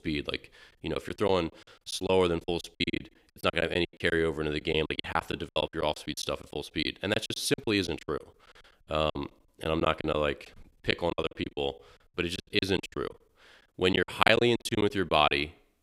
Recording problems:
choppy; very; 18% of the speech affected

